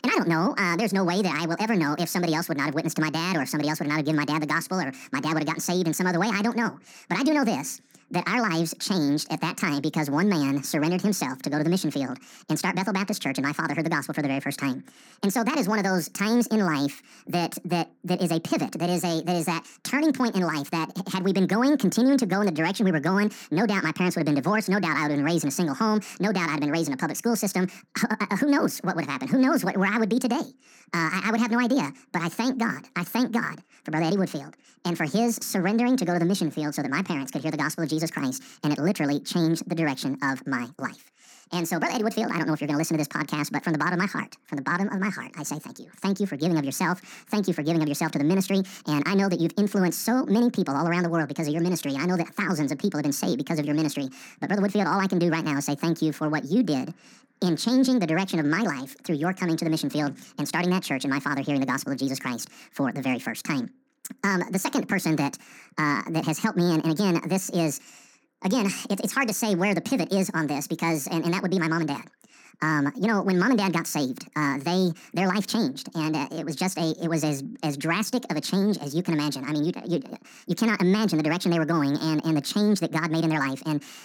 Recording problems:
wrong speed and pitch; too fast and too high; 1.7 times normal speed

